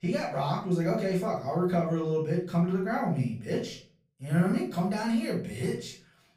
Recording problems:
off-mic speech; far
room echo; slight; dies away in 0.4 s

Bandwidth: 15 kHz